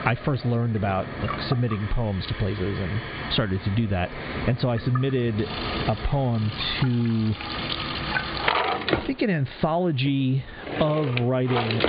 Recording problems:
high frequencies cut off; severe; nothing above 4.5 kHz
squashed, flat; heavily, background pumping
household noises; loud; throughout; 5 dB below the speech

